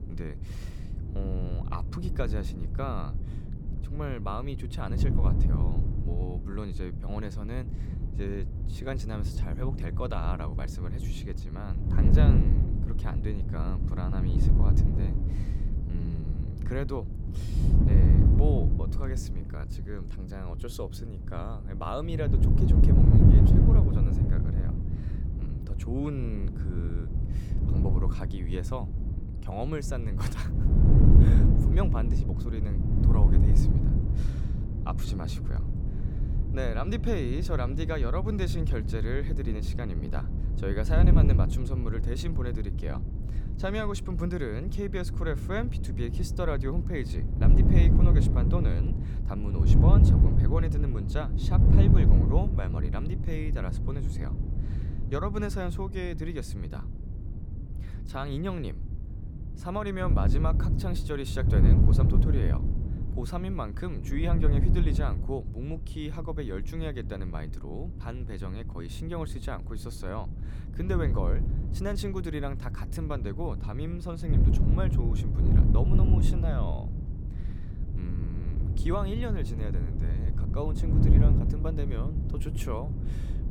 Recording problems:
wind noise on the microphone; heavy; 2 dB below the speech

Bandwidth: 18 kHz